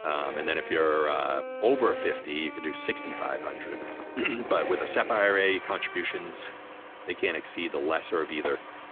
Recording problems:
phone-call audio; nothing above 3.5 kHz
muffled; very slightly; fading above 2.5 kHz
background music; noticeable; throughout; 10 dB below the speech
traffic noise; noticeable; throughout; 15 dB below the speech
footsteps; faint; at 3.5 s; peak 15 dB below the speech
jangling keys; faint; at 6.5 s; peak 15 dB below the speech
door banging; faint; at 8.5 s; peak 10 dB below the speech

